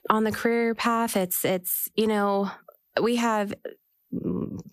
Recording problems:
squashed, flat; heavily

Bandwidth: 14.5 kHz